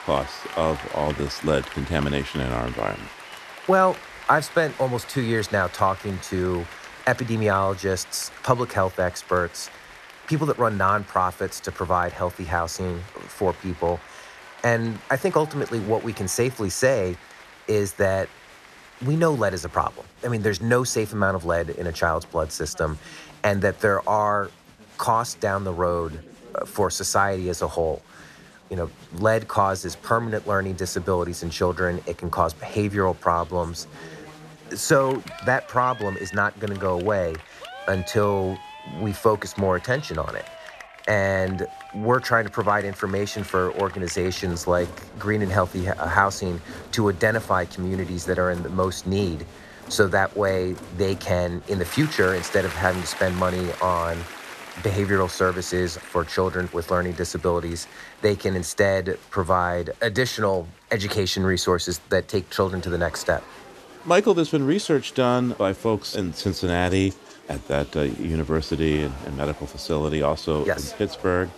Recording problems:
crowd noise; noticeable; throughout; 15 dB below the speech

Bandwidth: 13.5 kHz